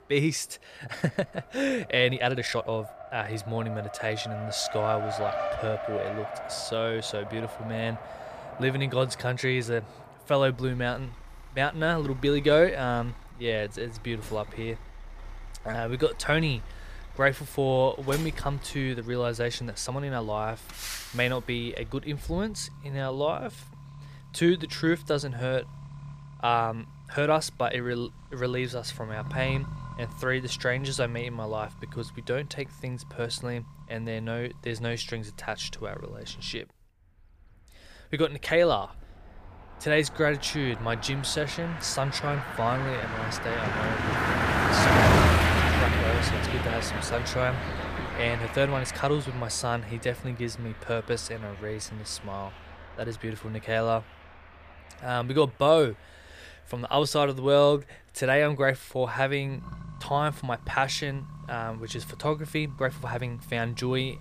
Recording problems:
traffic noise; loud; throughout; 2 dB below the speech
uneven, jittery; strongly; from 0.5 s to 1:04

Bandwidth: 15 kHz